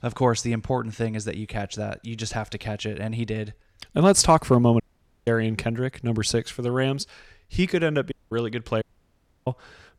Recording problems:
audio cutting out; at 5 s, at 8 s and at 9 s for 0.5 s

